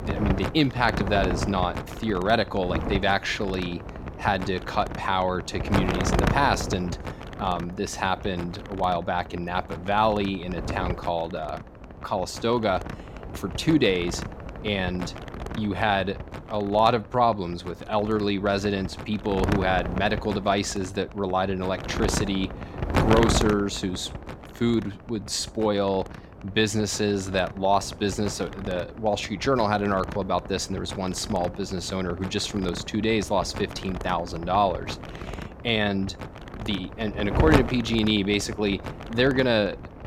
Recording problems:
wind noise on the microphone; heavy; 9 dB below the speech

